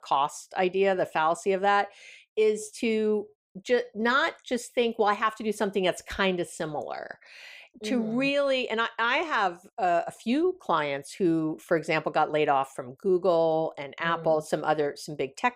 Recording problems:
none

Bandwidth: 15.5 kHz